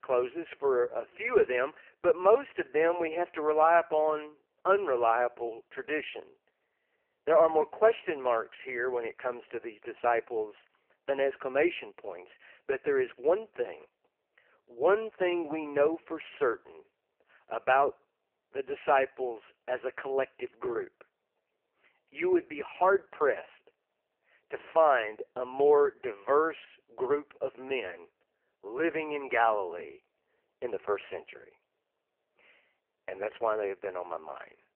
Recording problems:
phone-call audio; poor line; nothing above 3 kHz

